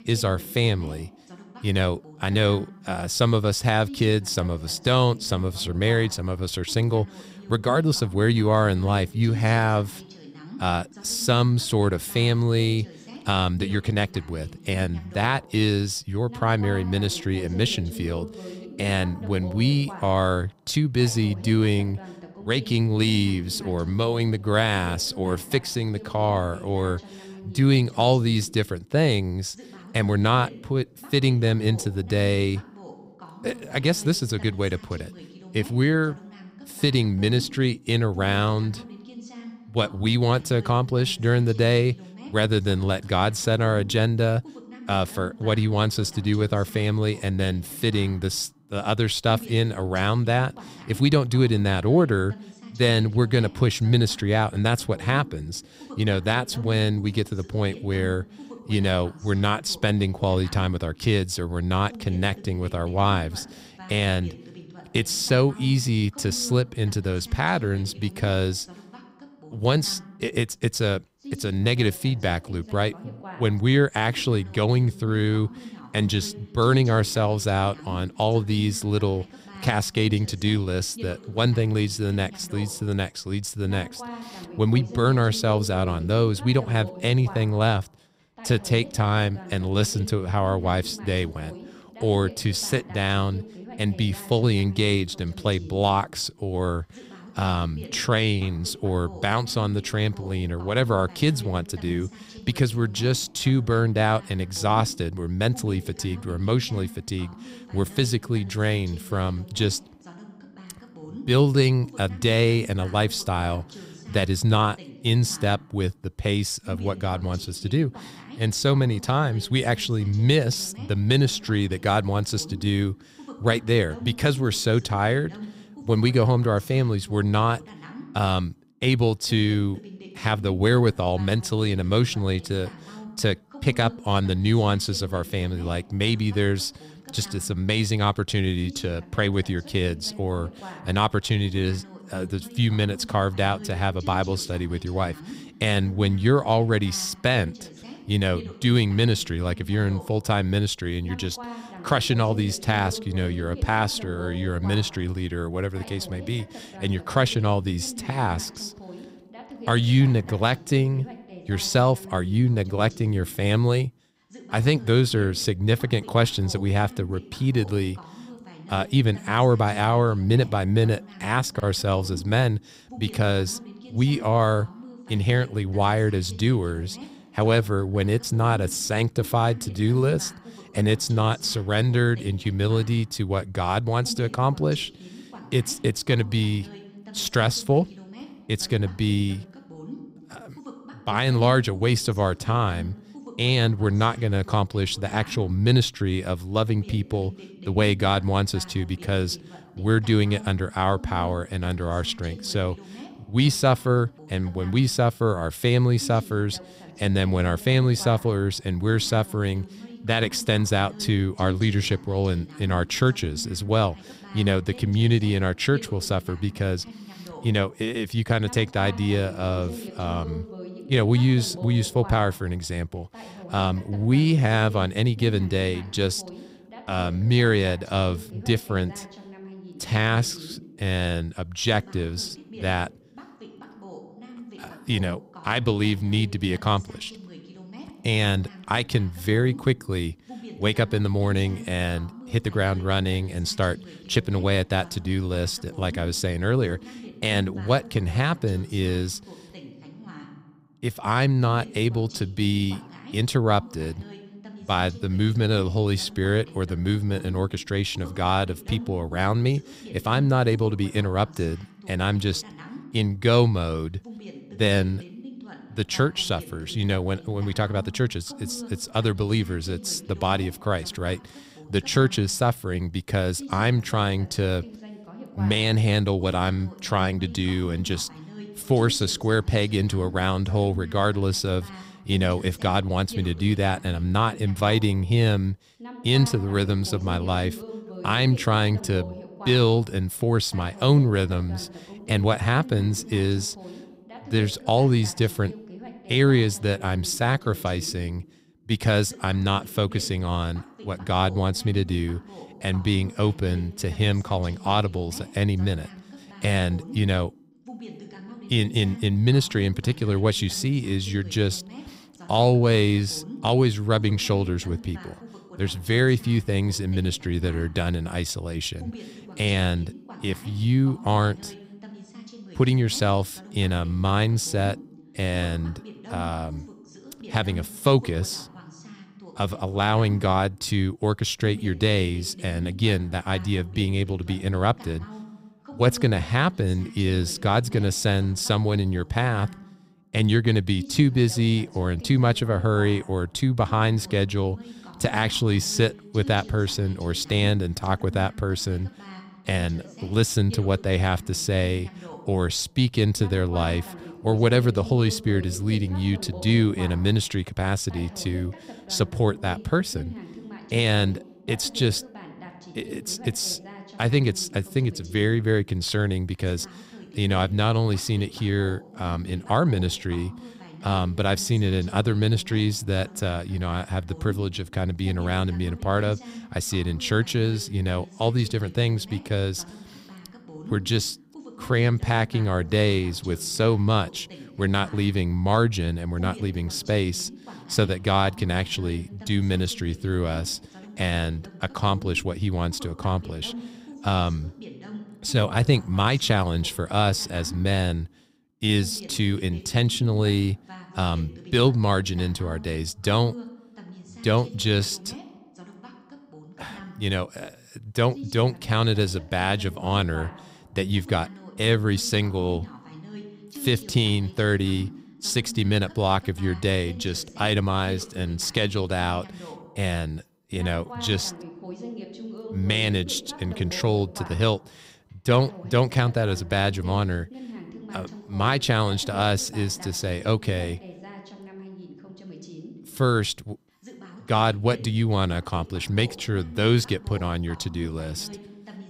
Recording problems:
voice in the background; noticeable; throughout; 20 dB below the speech

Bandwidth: 15.5 kHz